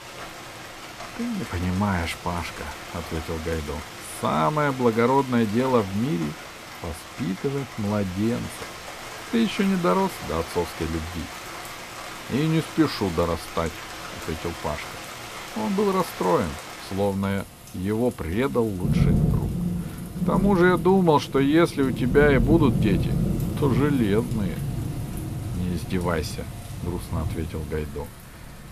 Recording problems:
rain or running water; loud; throughout; 7 dB below the speech

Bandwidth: 14.5 kHz